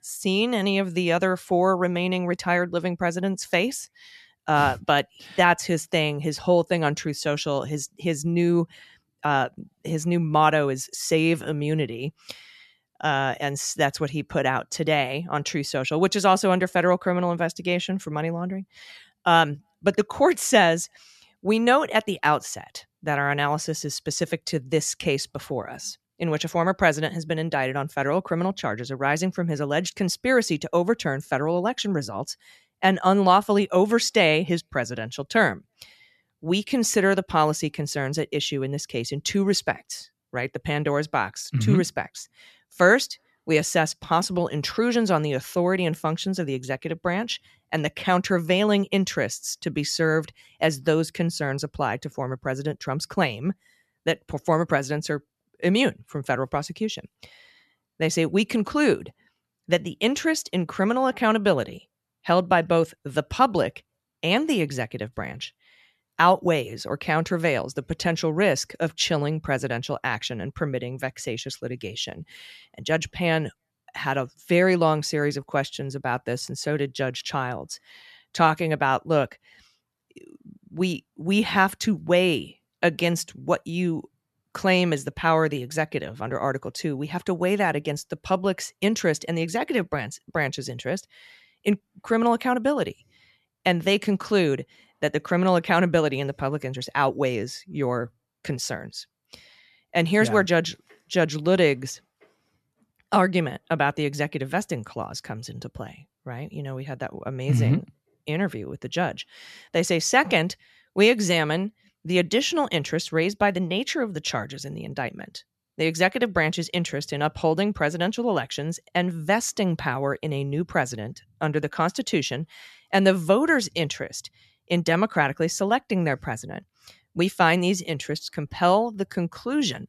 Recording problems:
none

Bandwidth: 13.5 kHz